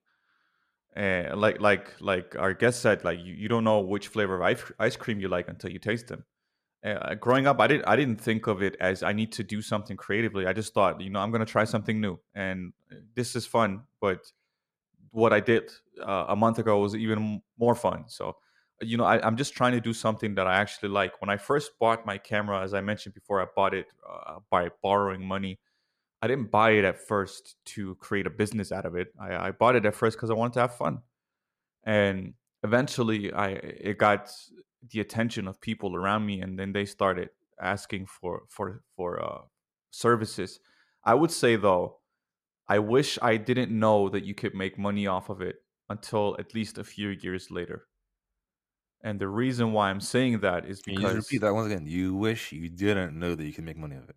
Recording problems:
none

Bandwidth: 14.5 kHz